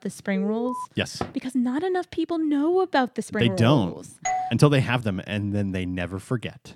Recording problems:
alarm; noticeable; at 0.5 s; peak 8 dB below the speech
uneven, jittery; strongly; from 1 to 5.5 s
door banging; faint; at 1 s; peak 10 dB below the speech
doorbell; noticeable; at 4.5 s; peak 3 dB below the speech

